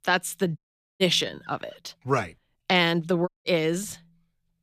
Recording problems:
audio cutting out; at 0.5 s and at 3.5 s

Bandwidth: 14.5 kHz